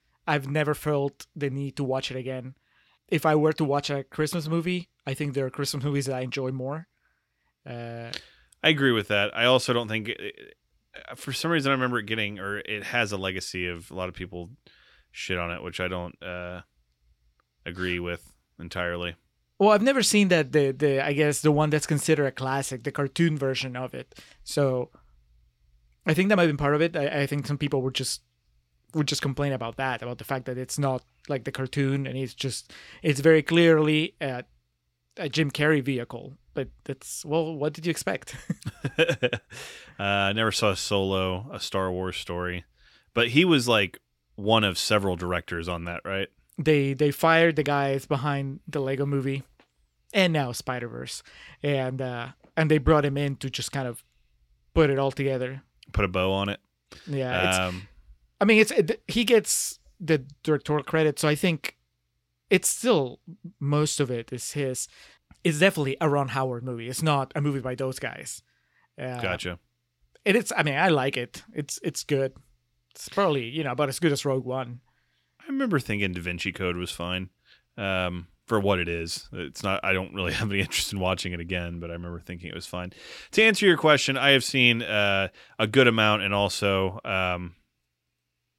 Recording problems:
none

